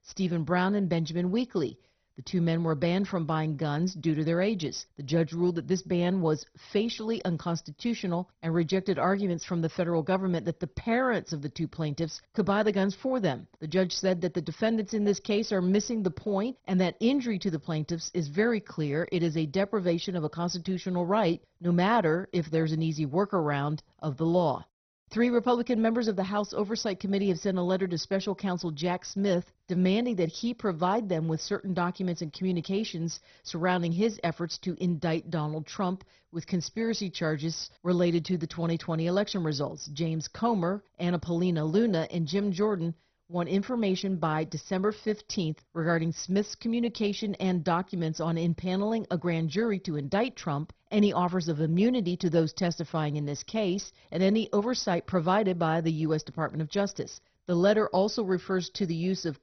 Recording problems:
garbled, watery; badly; nothing above 6 kHz

